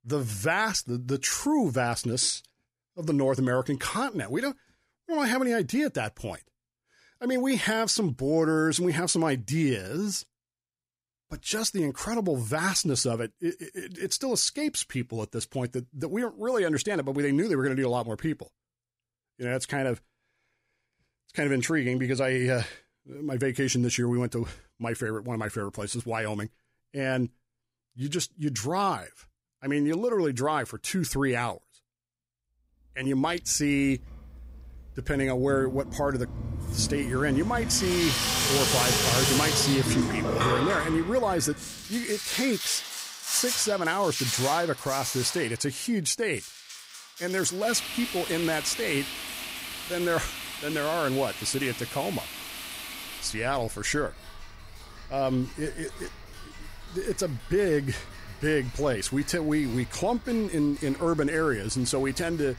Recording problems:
household noises; loud; from 33 s on; 3 dB below the speech

